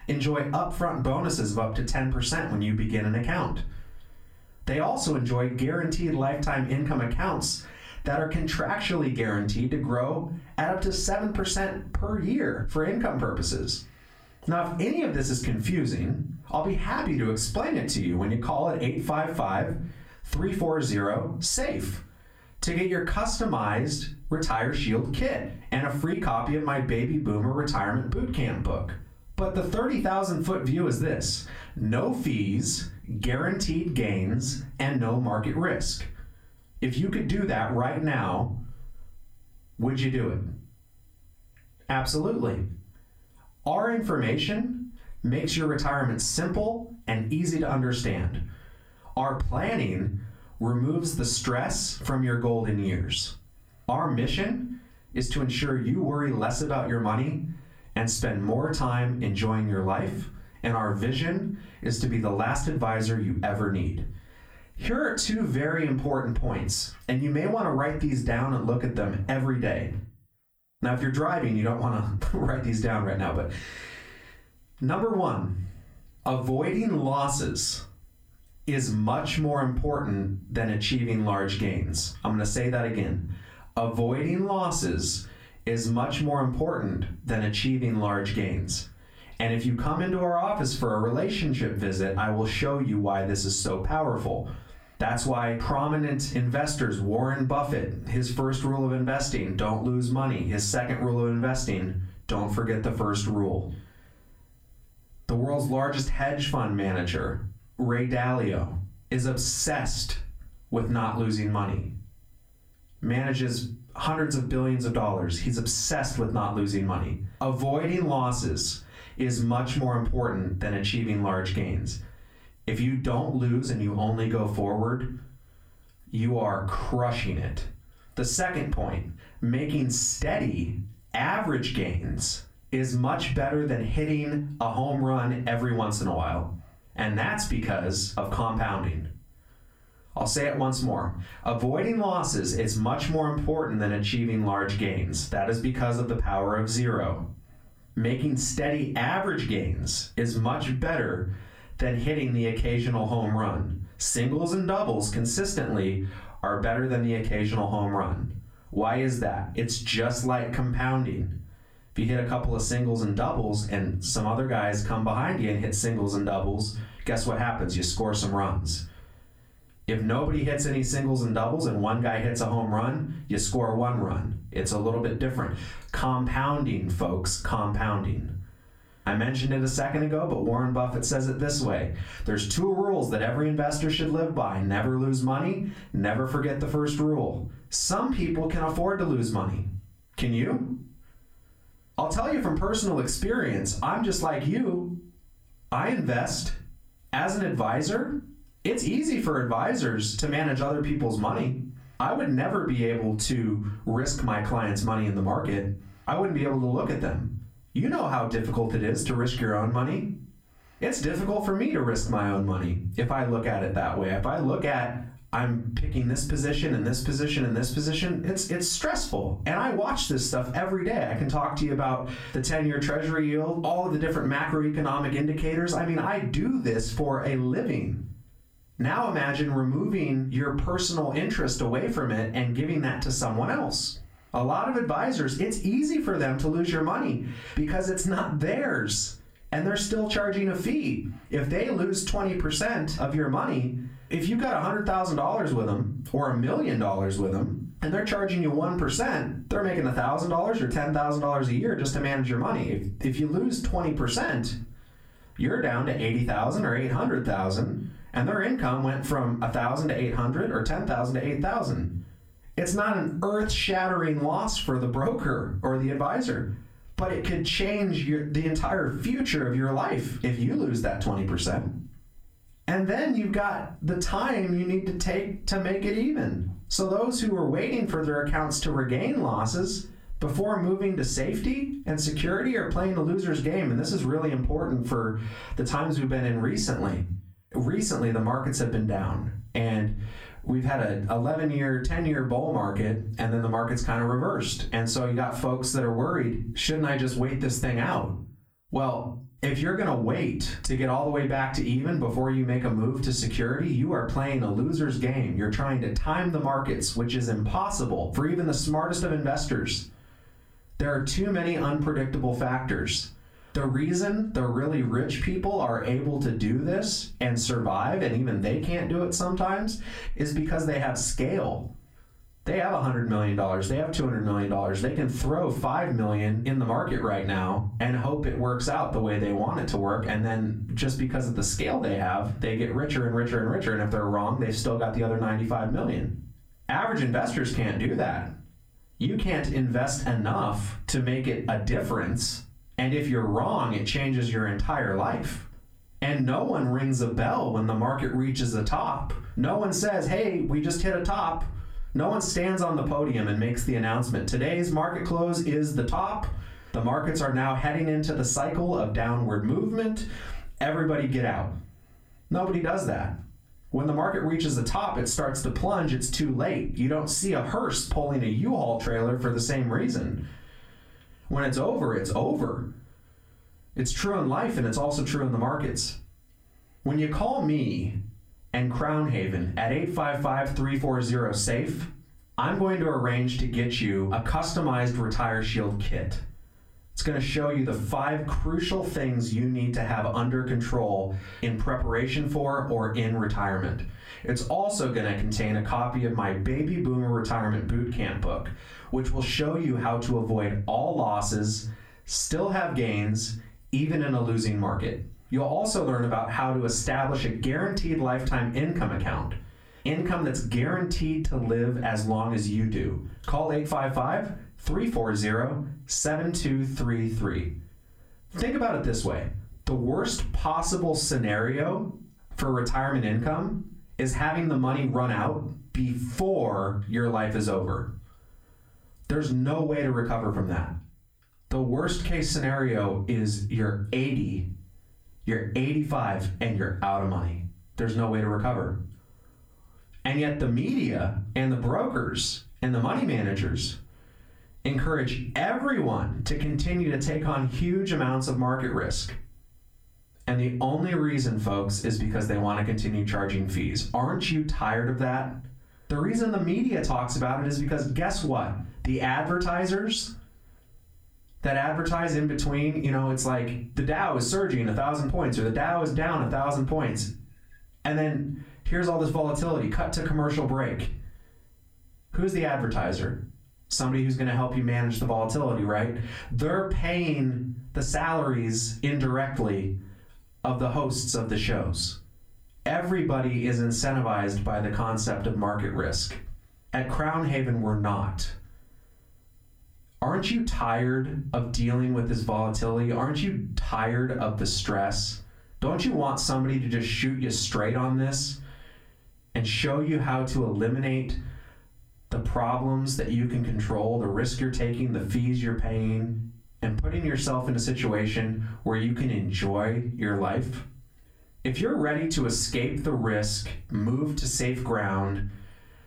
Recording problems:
off-mic speech; far
squashed, flat; heavily
room echo; very slight; dies away in 0.3 s

